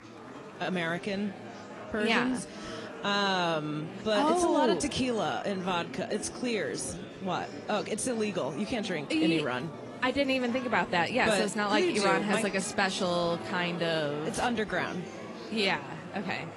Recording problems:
garbled, watery; slightly
murmuring crowd; noticeable; throughout; 10 dB below the speech

